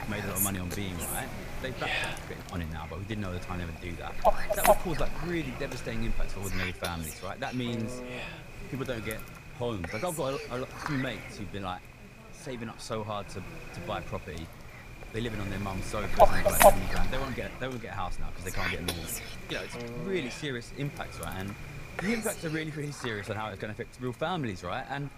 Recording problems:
animal sounds; very loud; throughout; 4 dB above the speech

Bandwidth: 15 kHz